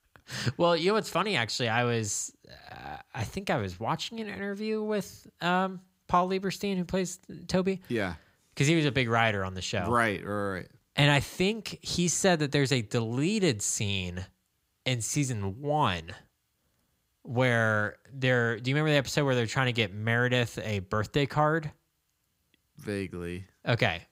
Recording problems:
none

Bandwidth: 15.5 kHz